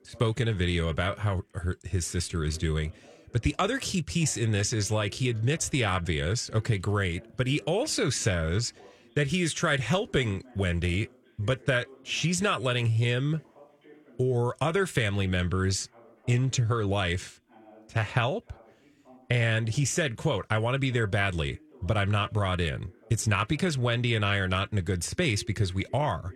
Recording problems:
voice in the background; faint; throughout; 25 dB below the speech

